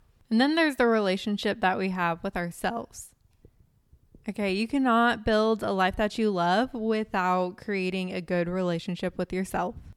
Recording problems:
none

